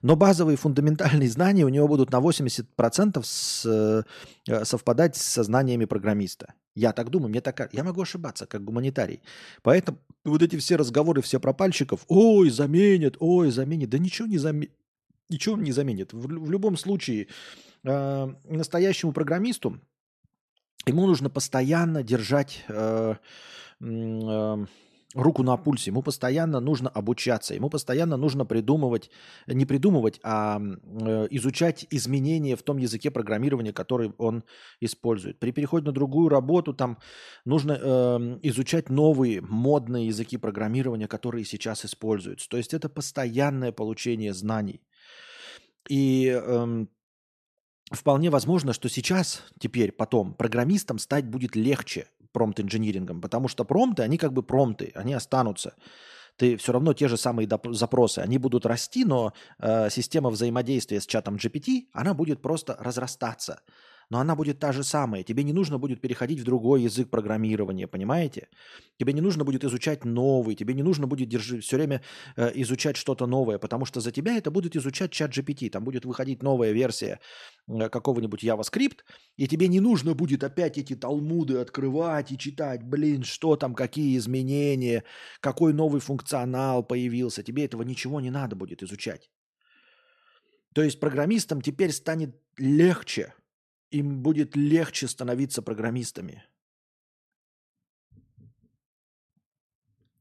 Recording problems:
none

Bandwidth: 13.5 kHz